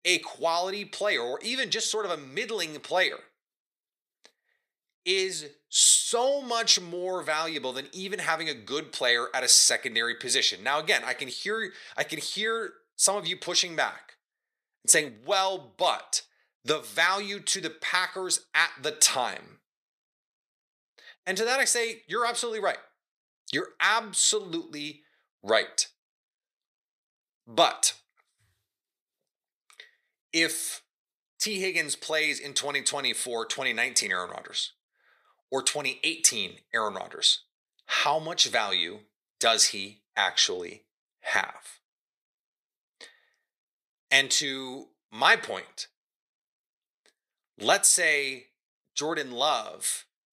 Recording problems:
thin; very; fading below 500 Hz

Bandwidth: 14.5 kHz